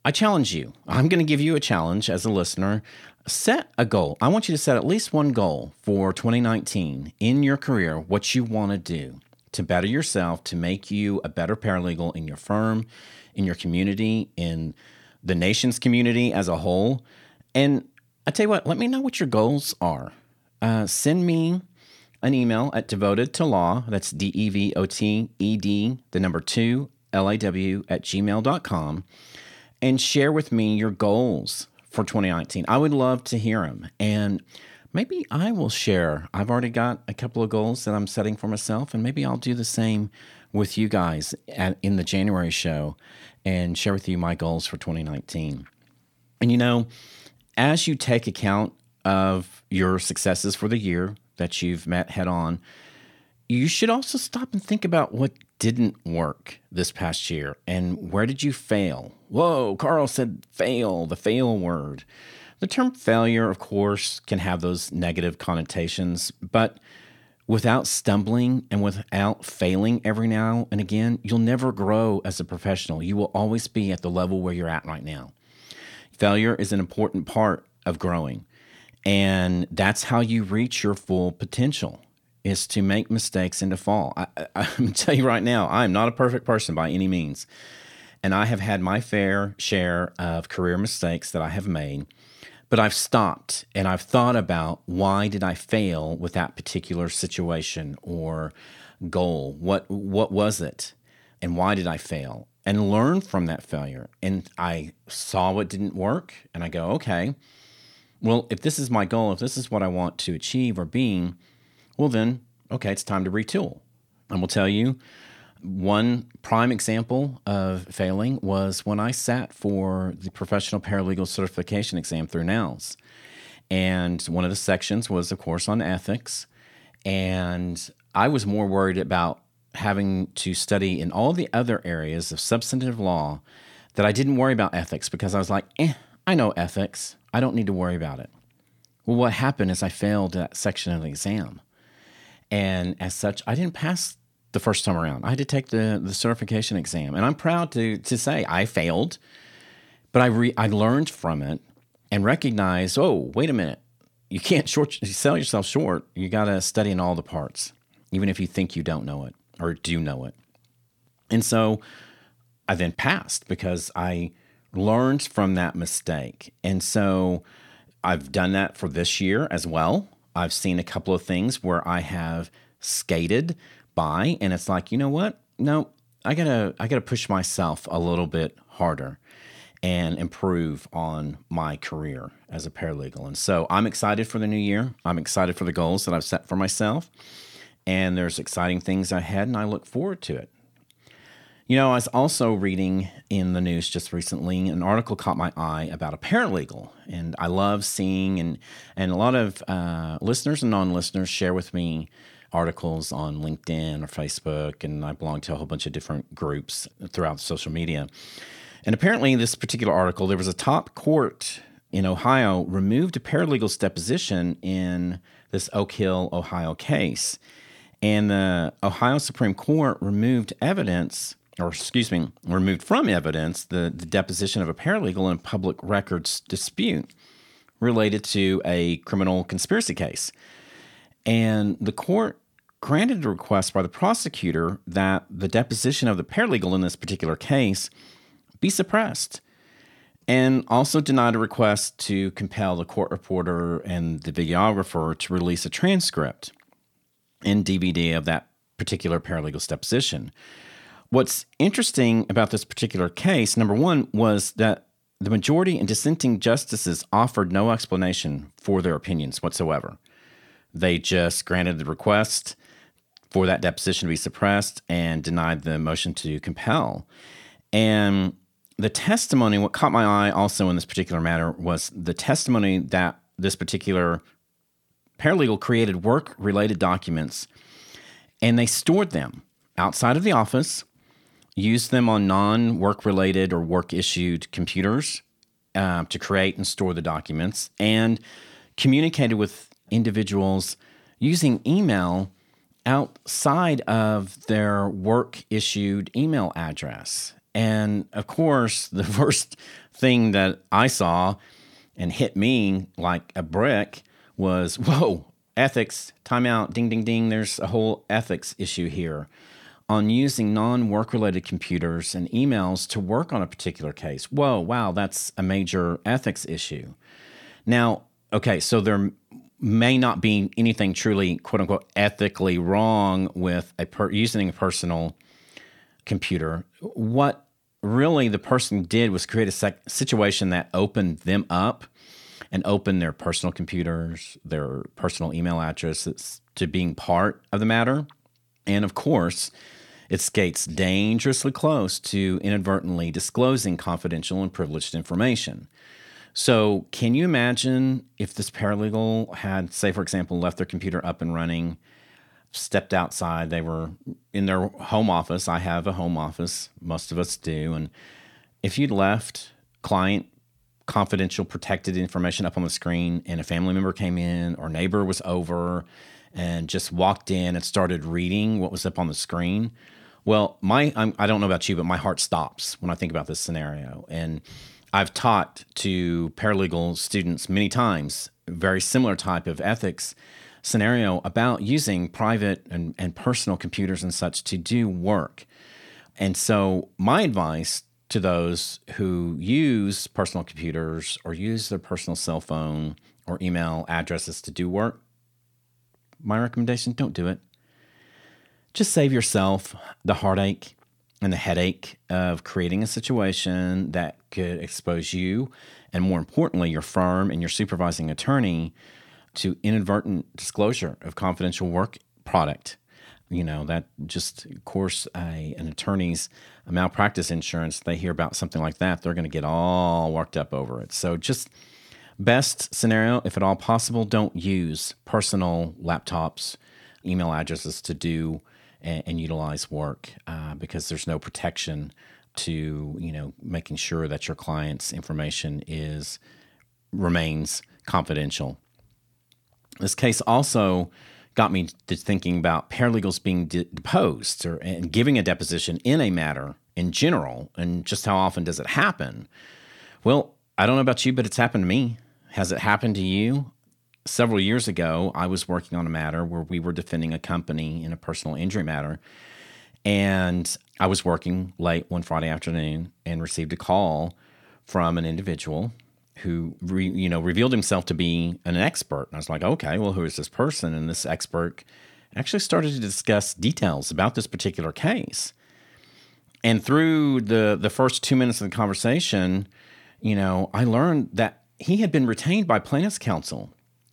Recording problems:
none

